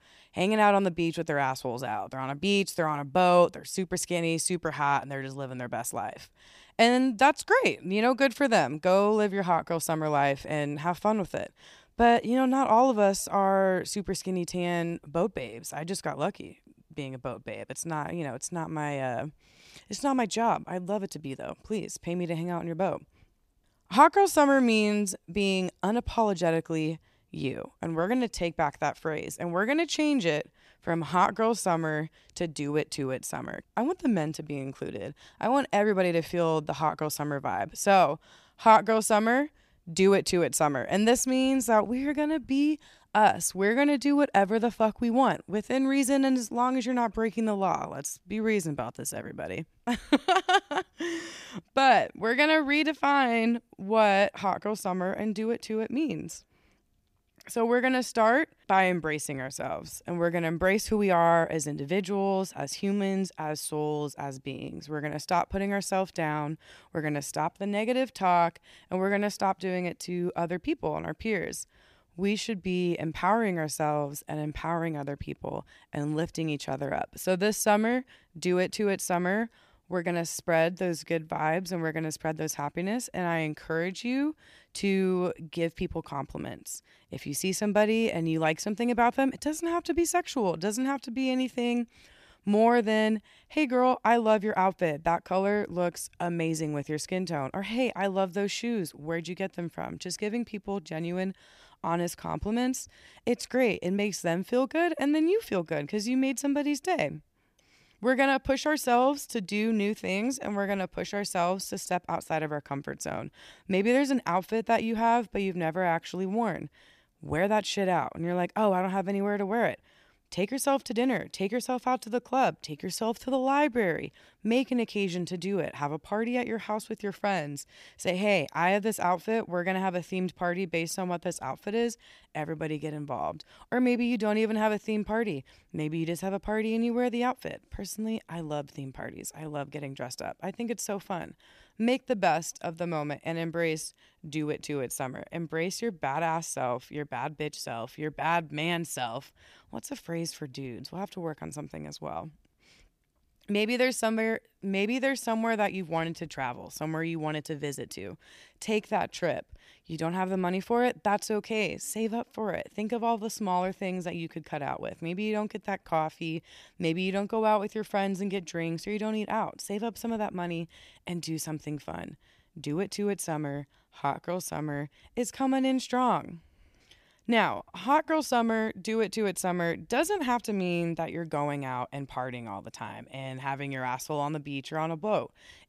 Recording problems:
none

